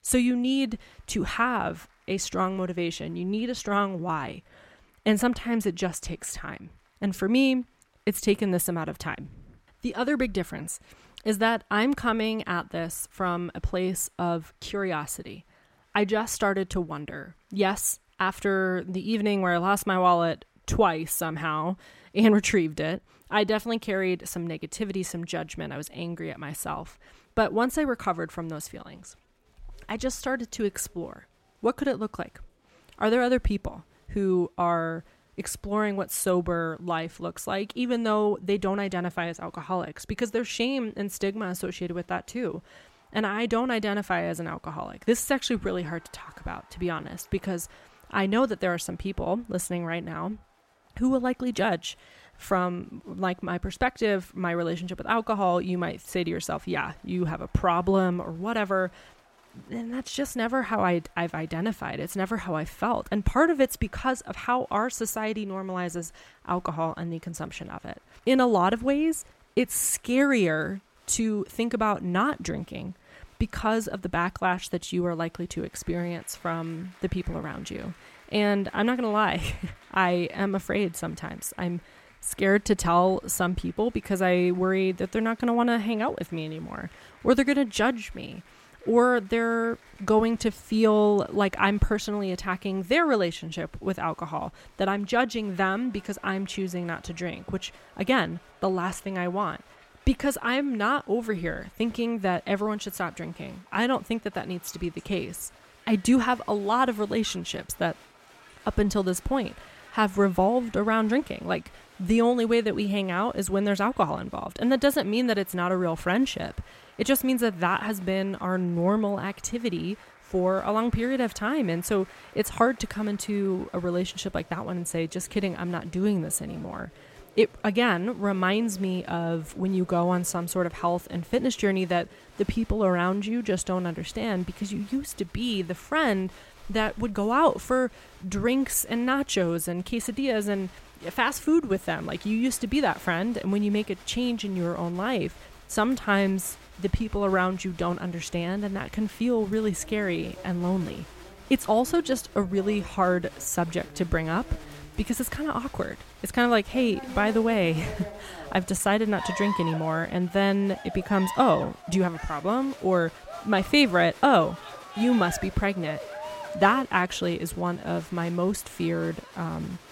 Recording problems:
crowd noise; noticeable; throughout; 20 dB below the speech

